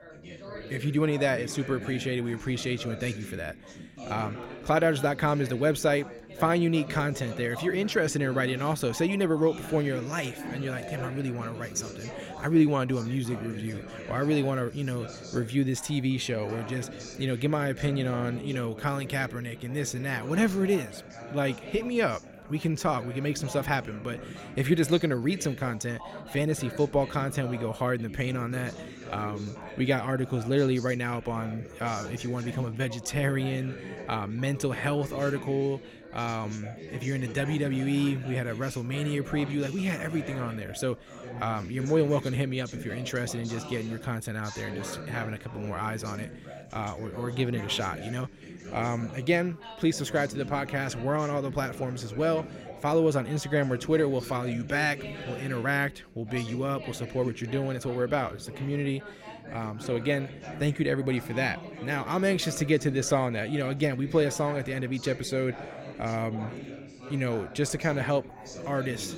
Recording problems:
background chatter; noticeable; throughout; 4 voices, 10 dB below the speech

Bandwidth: 16 kHz